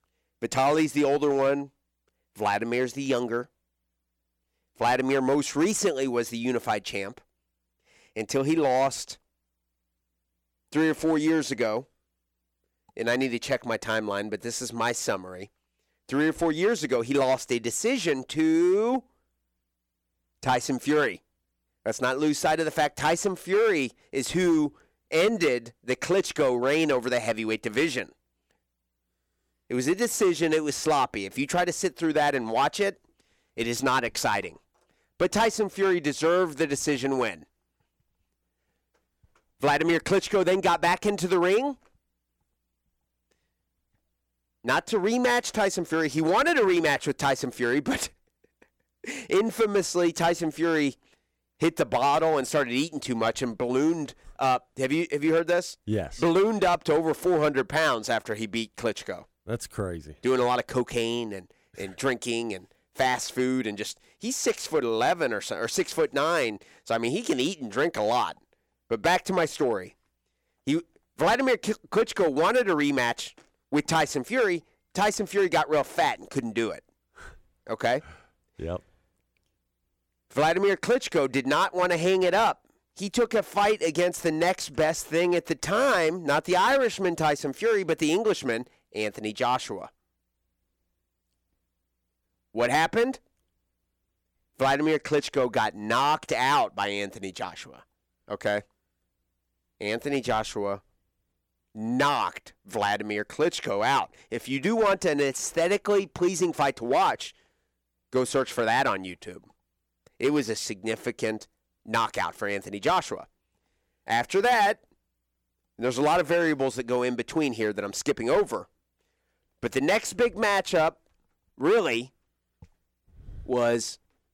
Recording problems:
distortion; slight; 4% of the sound clipped

